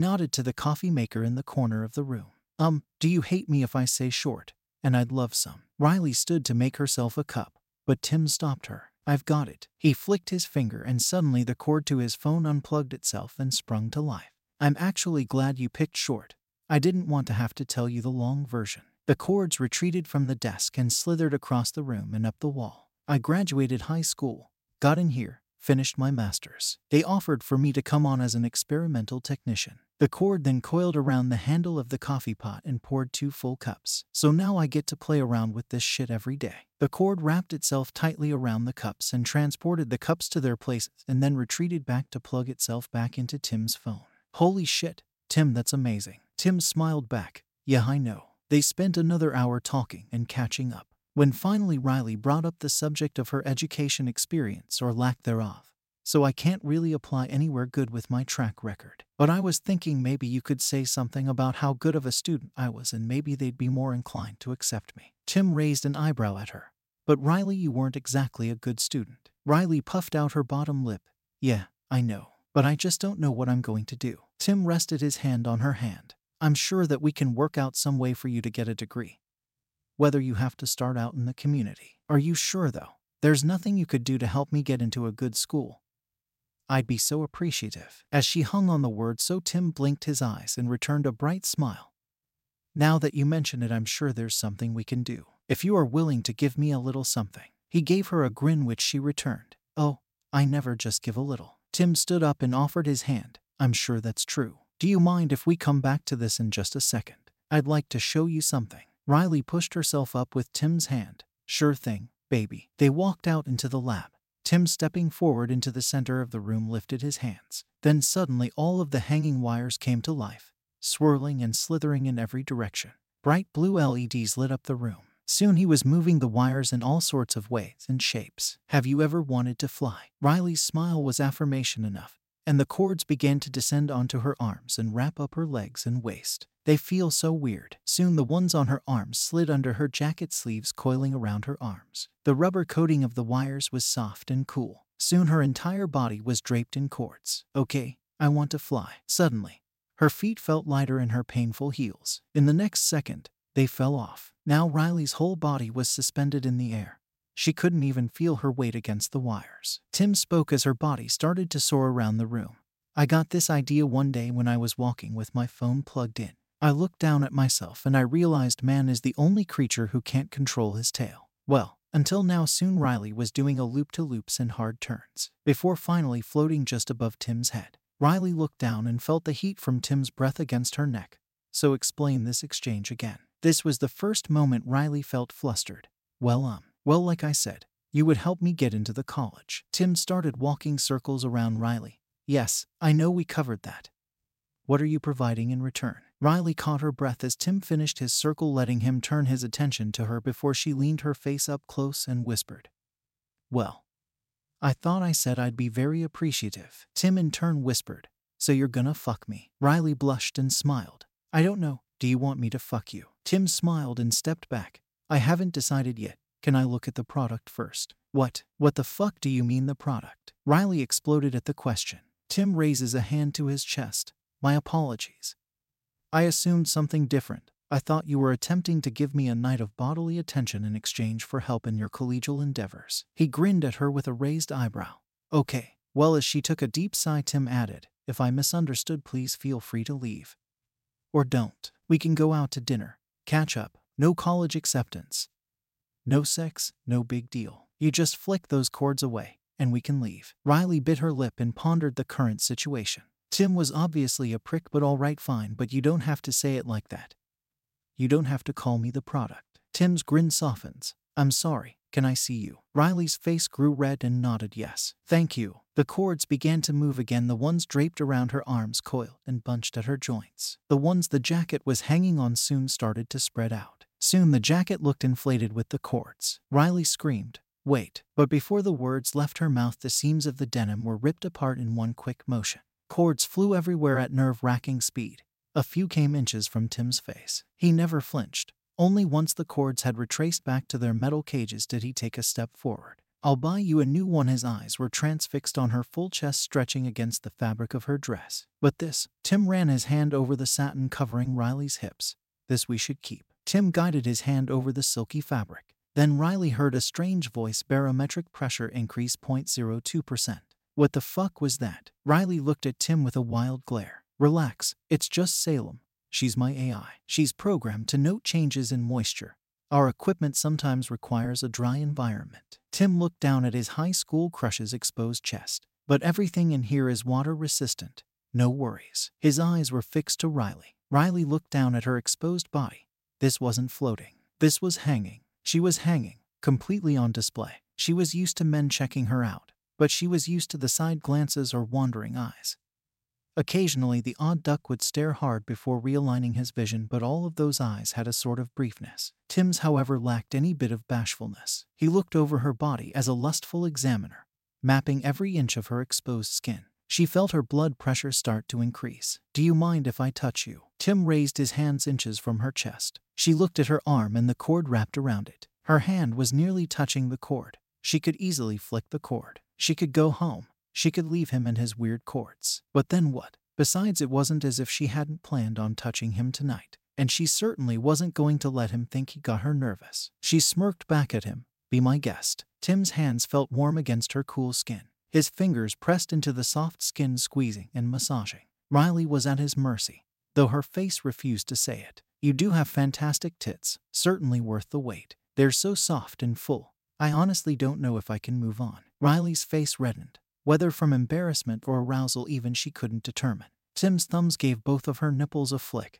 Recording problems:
abrupt cut into speech; at the start

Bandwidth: 16 kHz